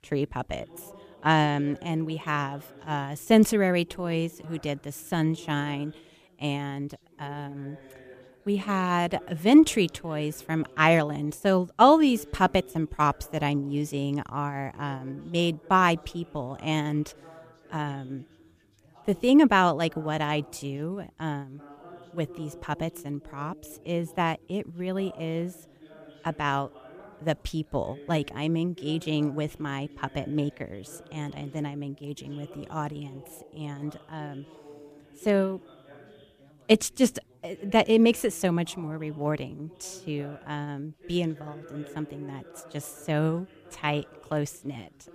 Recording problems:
background chatter; faint; throughout; 2 voices, 25 dB below the speech

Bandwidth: 14.5 kHz